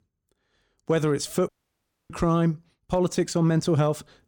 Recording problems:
audio cutting out; at 1.5 s for 0.5 s

